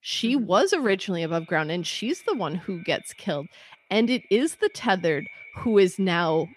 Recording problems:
echo of what is said; faint; throughout; 350 ms later, 25 dB below the speech

